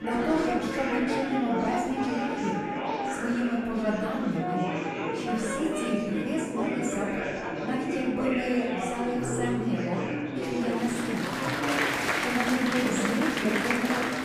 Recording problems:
off-mic speech; far
room echo; noticeable; dies away in 1 s
background music; loud; throughout; 7 dB below the speech
murmuring crowd; loud; throughout; as loud as the speech

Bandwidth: 15 kHz